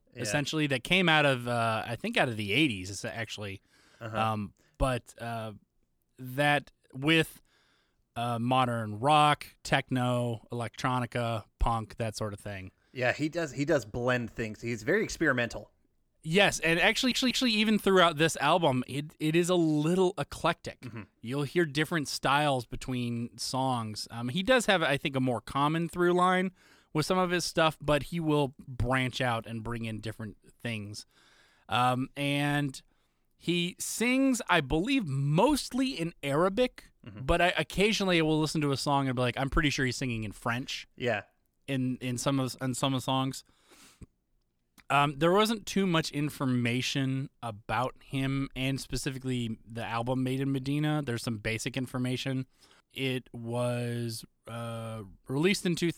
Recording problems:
audio stuttering; at 17 s

